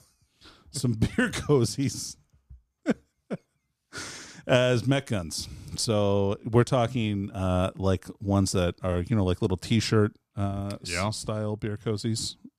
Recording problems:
none

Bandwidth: 14.5 kHz